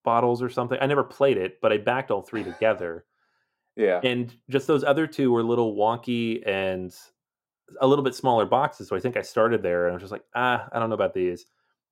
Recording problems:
muffled; slightly; fading above 1 kHz

